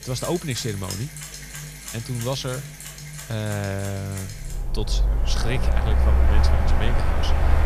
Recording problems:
machinery noise; very loud; throughout; 3 dB above the speech

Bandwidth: 14 kHz